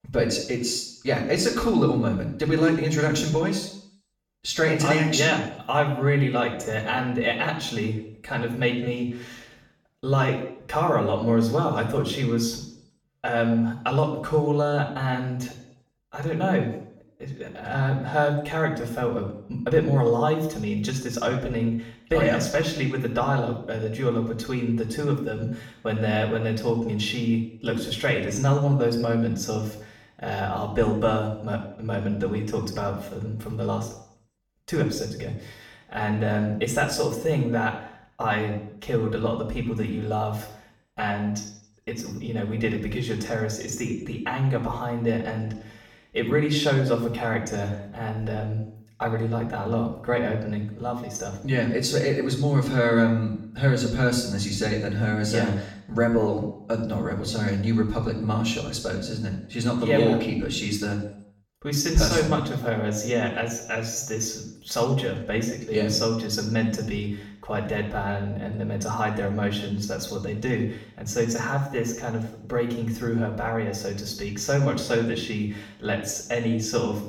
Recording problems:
off-mic speech; far
room echo; noticeable; dies away in 0.6 s

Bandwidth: 17 kHz